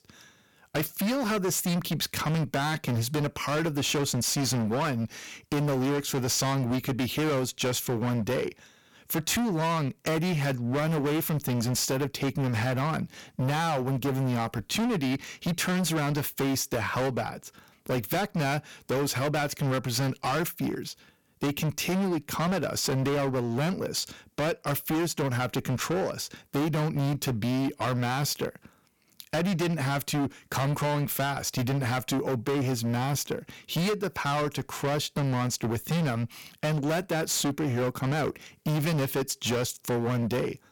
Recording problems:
distortion; heavy; 27% of the sound clipped

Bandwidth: 17.5 kHz